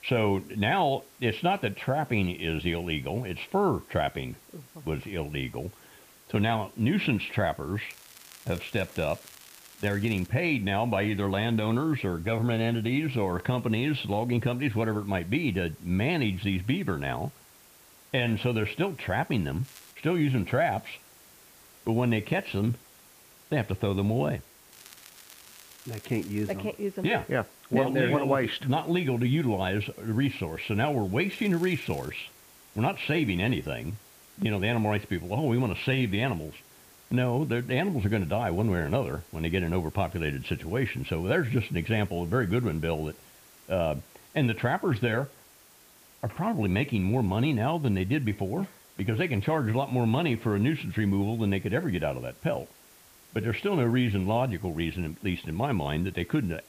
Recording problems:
muffled; very; fading above 3 kHz
hiss; faint; throughout; 25 dB below the speech
crackling; faint; 4 times, first at 8 s; 20 dB below the speech

